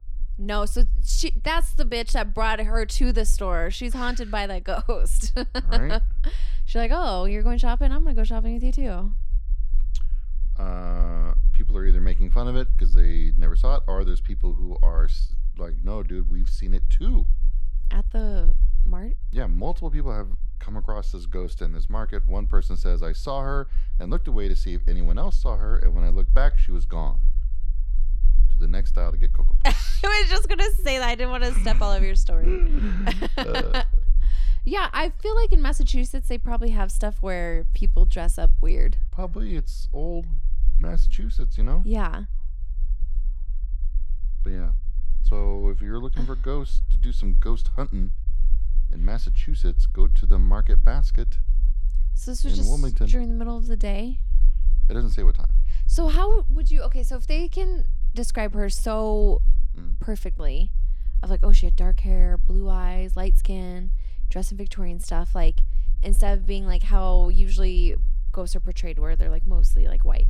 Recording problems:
low rumble; faint; throughout; 25 dB below the speech

